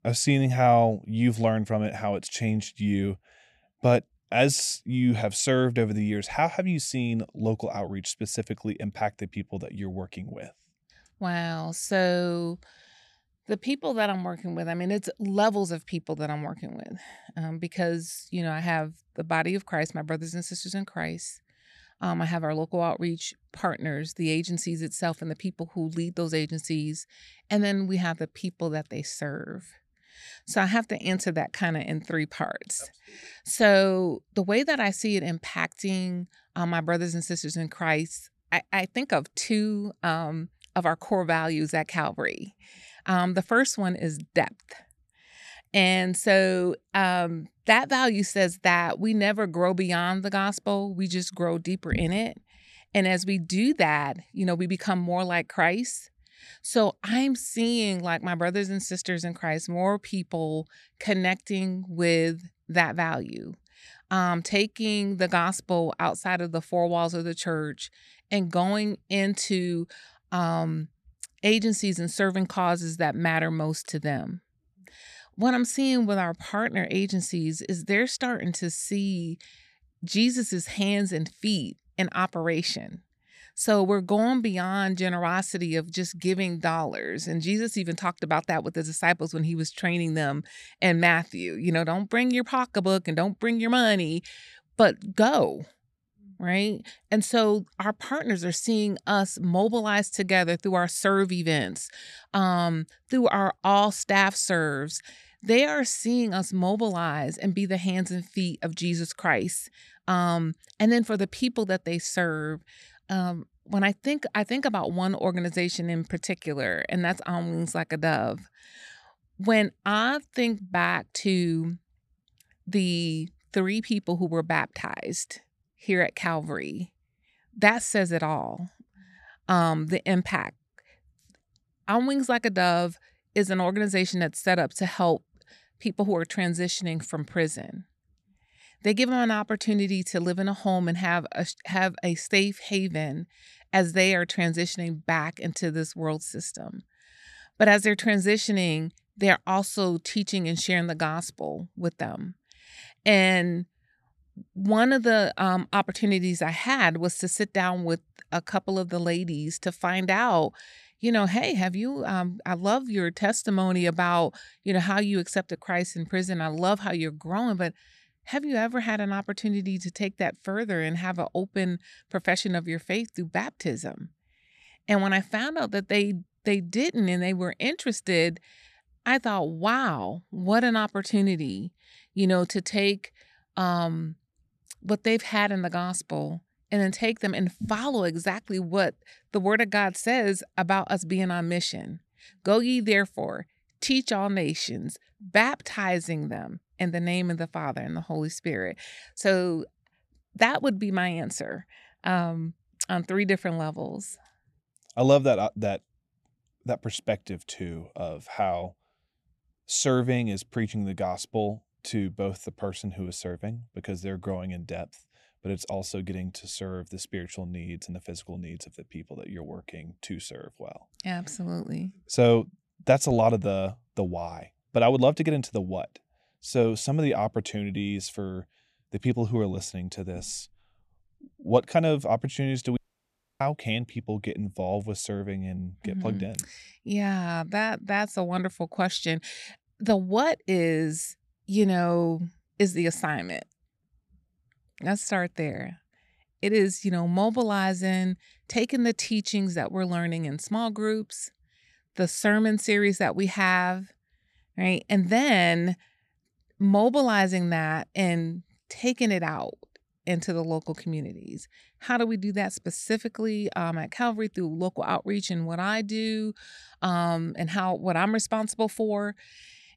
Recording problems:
audio cutting out; at 3:53 for 0.5 s

